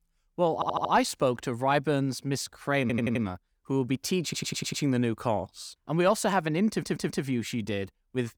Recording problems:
audio stuttering; 4 times, first at 0.5 s

